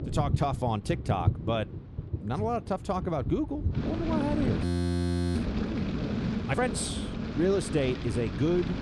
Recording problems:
rain or running water; loud; throughout; 2 dB below the speech
audio freezing; at 4.5 s for 0.5 s

